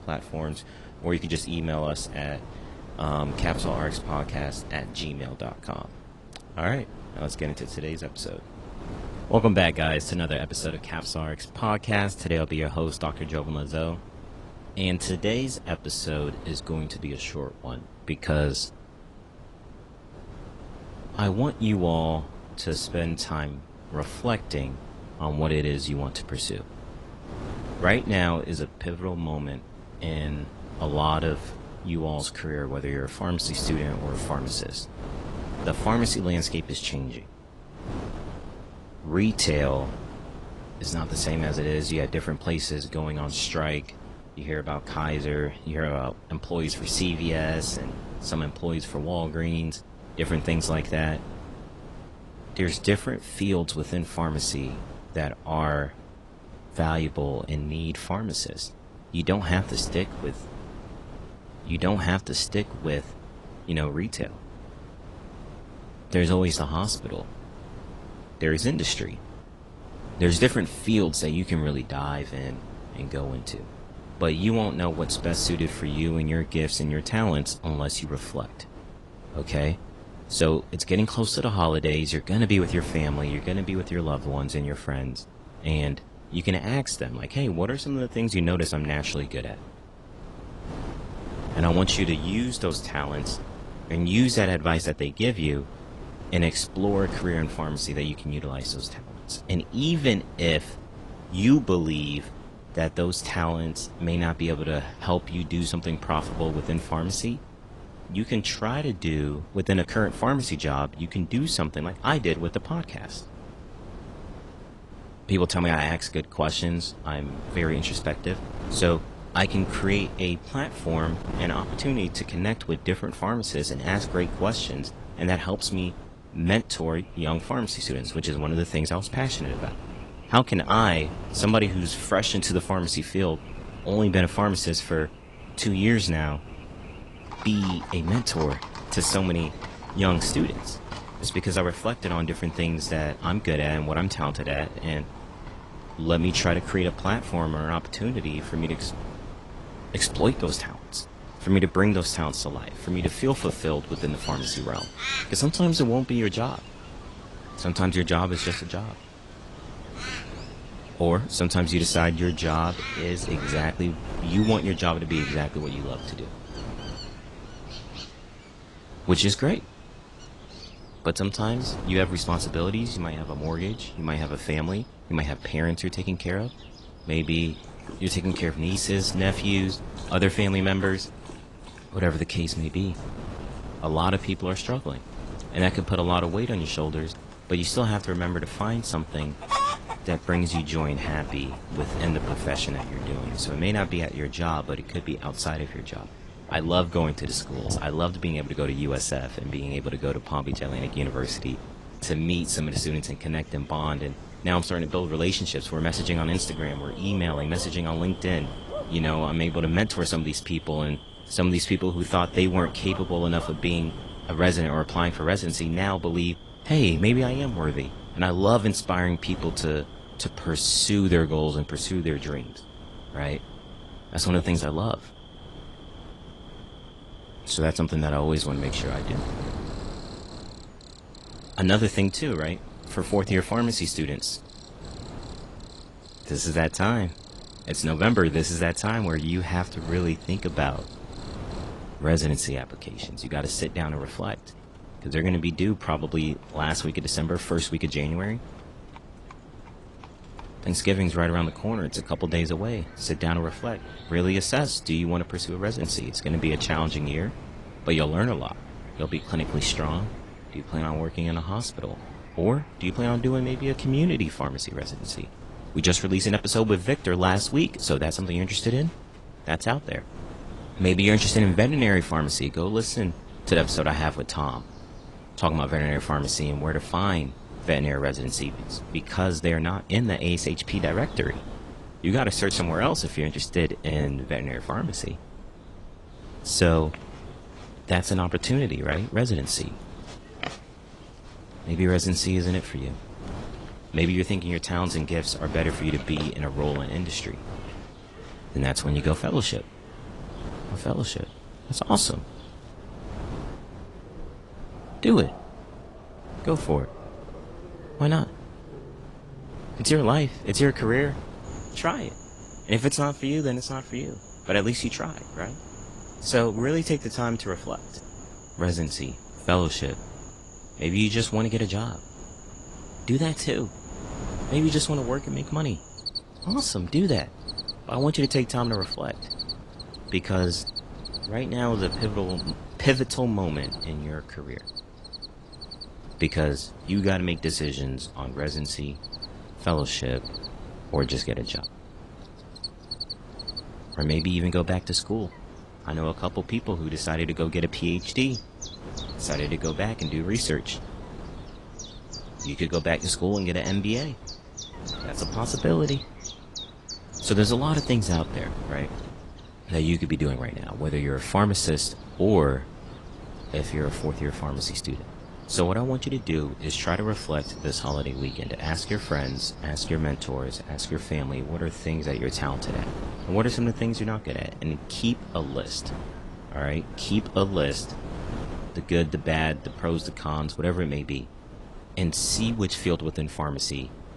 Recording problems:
garbled, watery; slightly; nothing above 10.5 kHz
animal sounds; noticeable; from 2:07 on; 15 dB below the speech
wind noise on the microphone; occasional gusts; 15 dB below the speech

